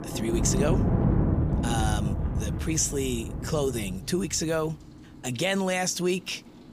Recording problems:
rain or running water; very loud; throughout; 1 dB above the speech

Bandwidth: 15 kHz